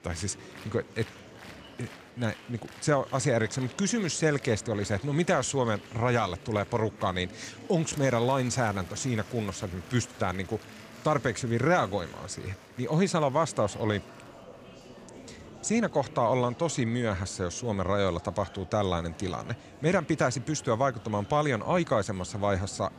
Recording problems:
murmuring crowd; noticeable; throughout; 20 dB below the speech

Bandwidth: 15 kHz